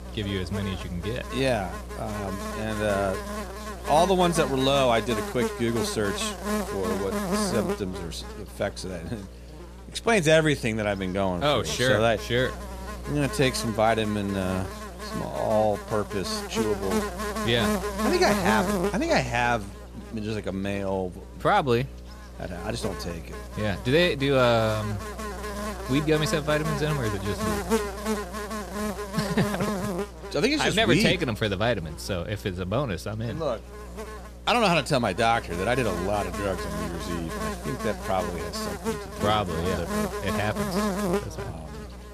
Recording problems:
electrical hum; loud; throughout; 60 Hz, 7 dB below the speech

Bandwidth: 14.5 kHz